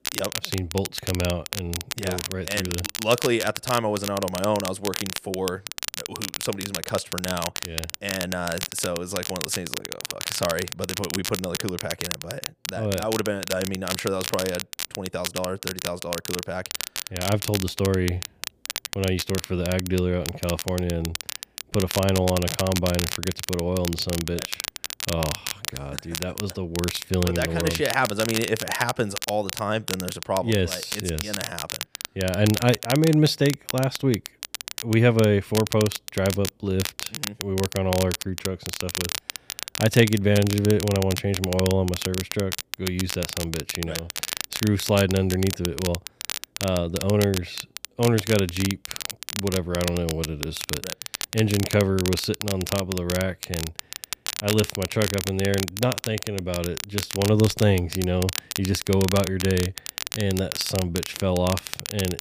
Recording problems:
crackle, like an old record; loud; 6 dB below the speech

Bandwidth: 15 kHz